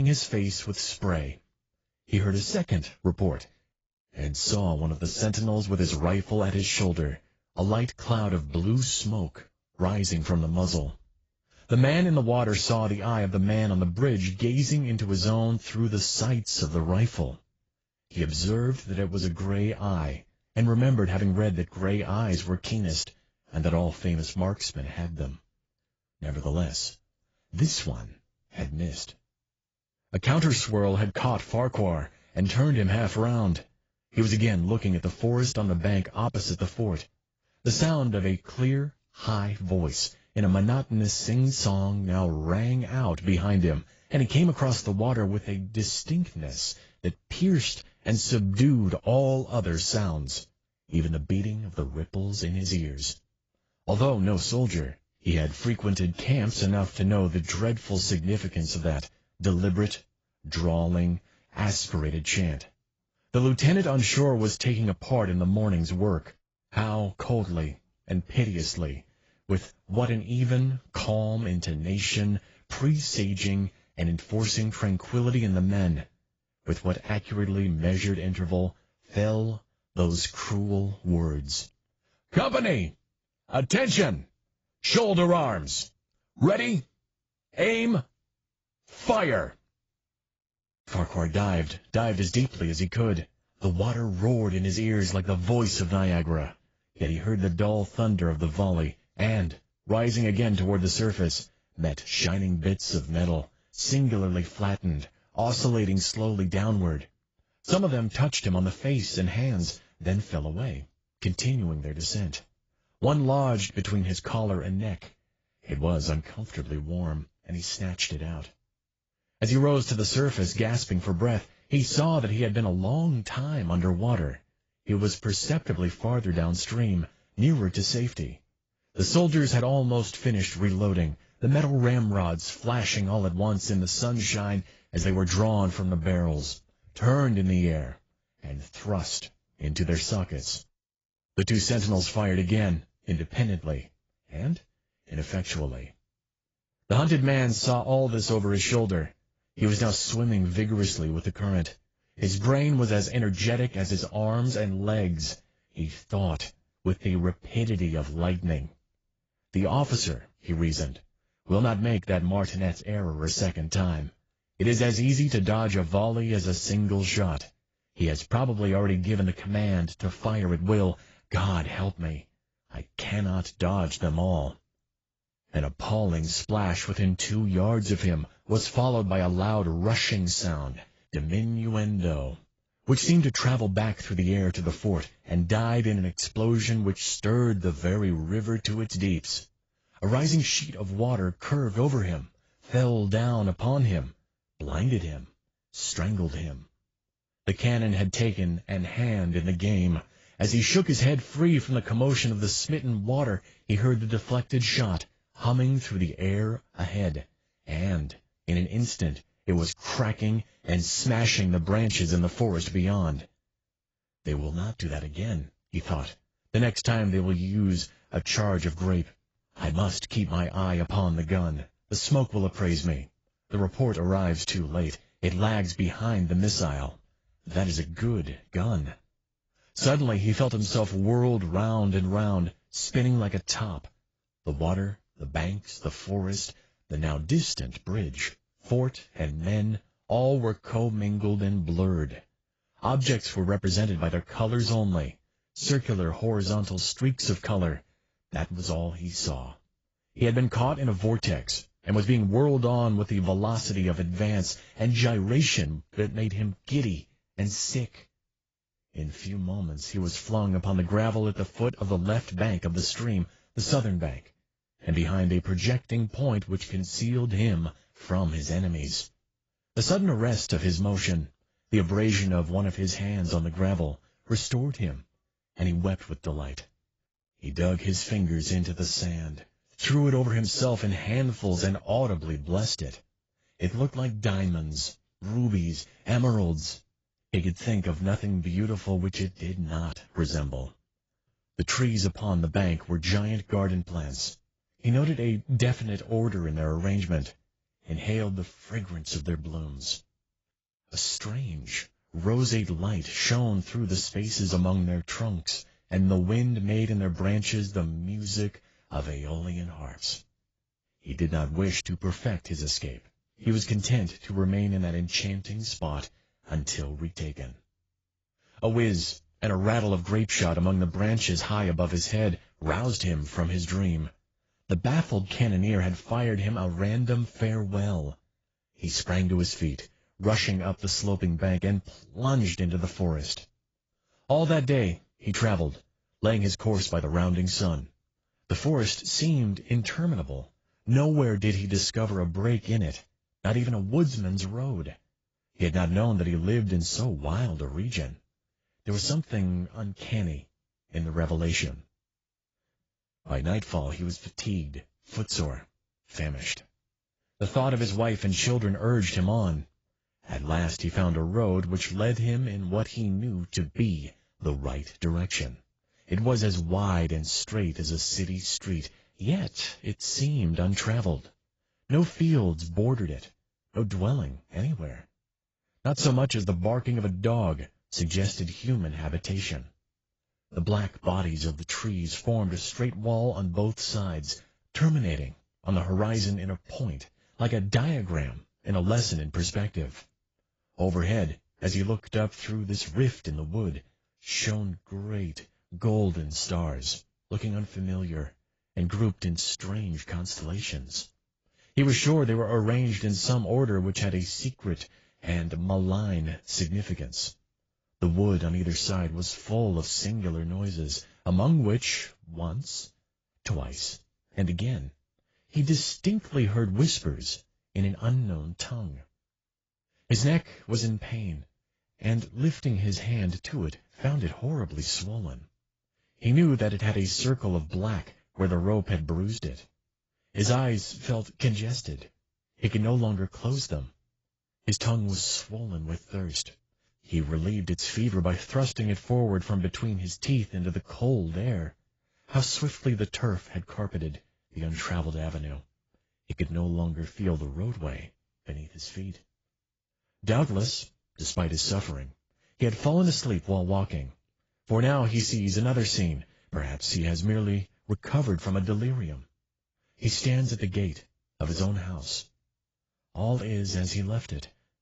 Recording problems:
garbled, watery; badly; nothing above 7.5 kHz
abrupt cut into speech; at the start

